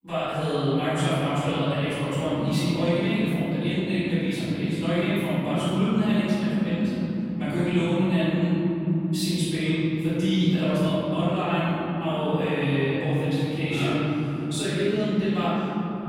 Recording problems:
room echo; strong; dies away in 3 s
off-mic speech; far

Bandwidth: 16 kHz